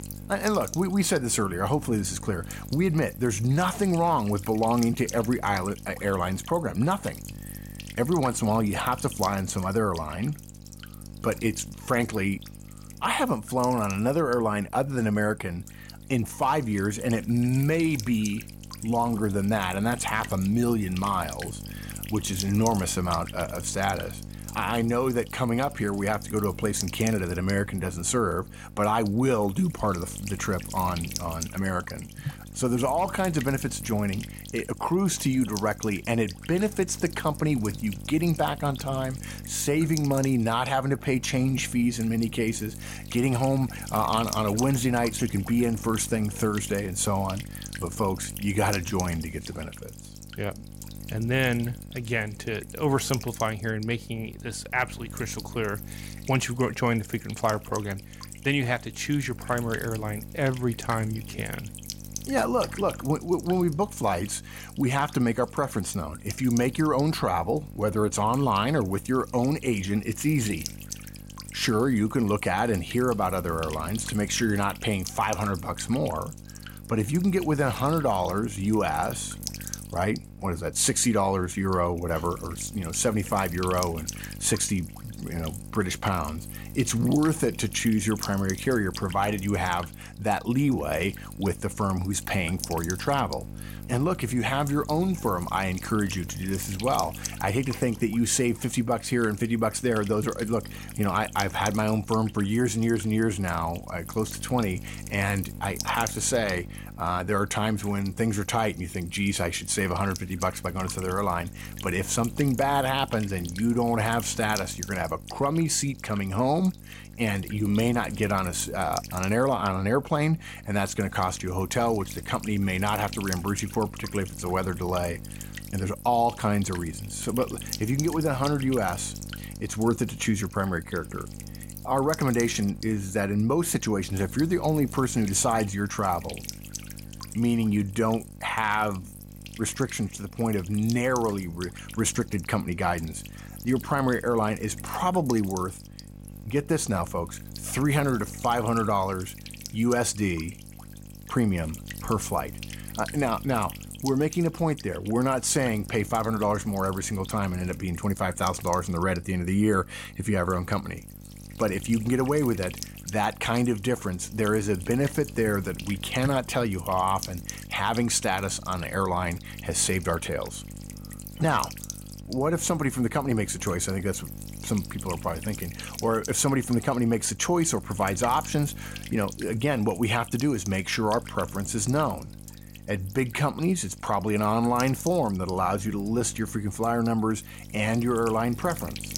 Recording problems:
electrical hum; noticeable; throughout; 50 Hz, 15 dB below the speech

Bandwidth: 16 kHz